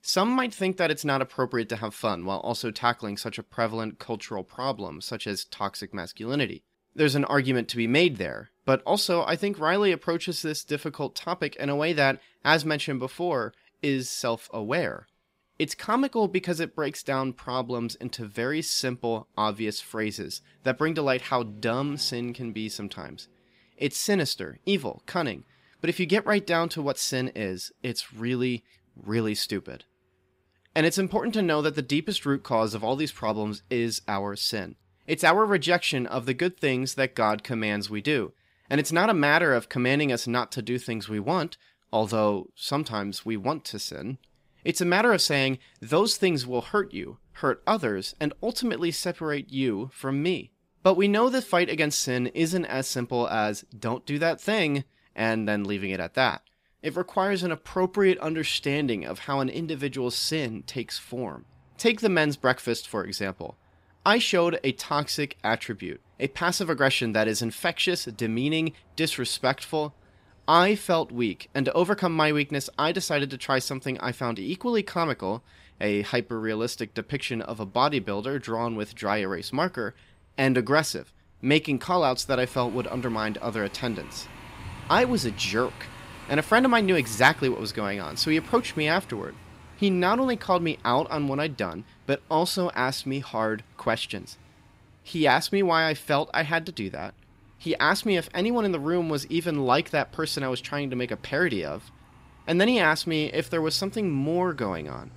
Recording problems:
traffic noise; faint; throughout; 25 dB below the speech

